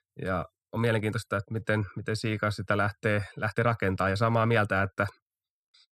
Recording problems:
uneven, jittery; strongly; from 0.5 to 4.5 s

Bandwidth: 14.5 kHz